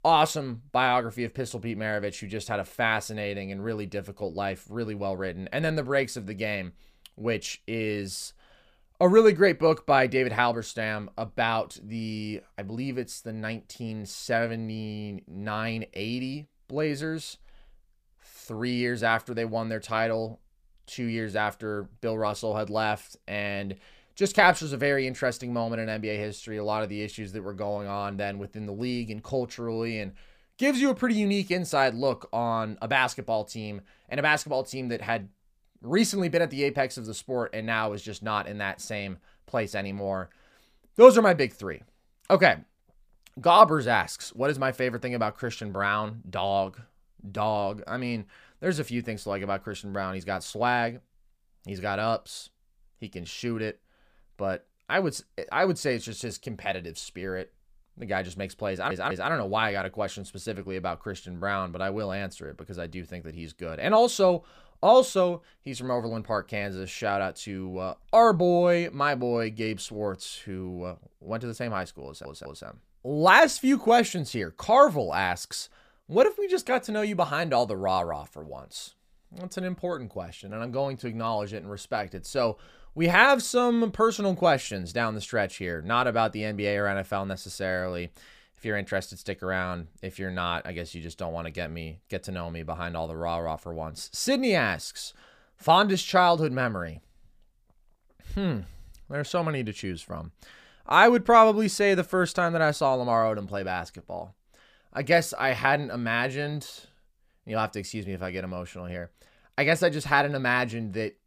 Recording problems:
audio stuttering; at 59 s and at 1:12

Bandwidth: 15 kHz